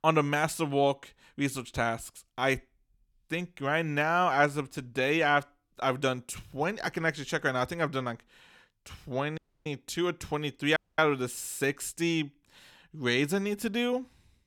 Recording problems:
audio cutting out; at 9.5 s and at 11 s

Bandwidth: 17.5 kHz